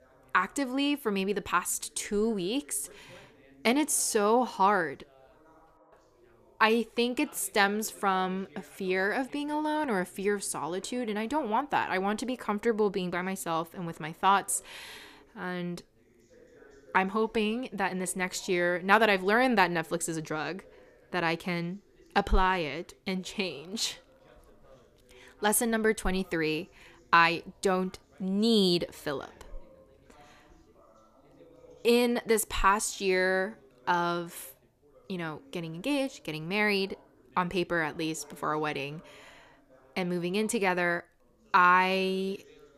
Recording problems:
background chatter; faint; throughout; 2 voices, 30 dB below the speech

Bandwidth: 14.5 kHz